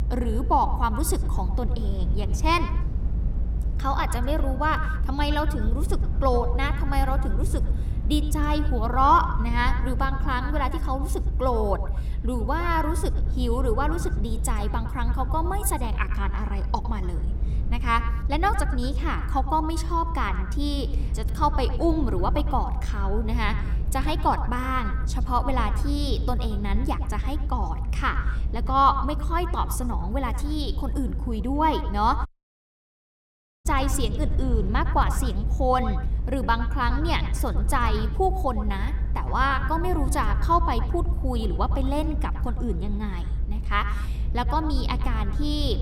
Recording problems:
echo of what is said; strong; throughout; 110 ms later, 10 dB below the speech
low rumble; noticeable; throughout; 20 dB below the speech
audio cutting out; at 32 s for 1.5 s

